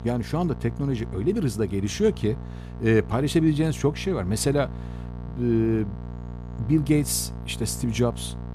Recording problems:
electrical hum; noticeable; throughout; 60 Hz, 15 dB below the speech

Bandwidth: 14 kHz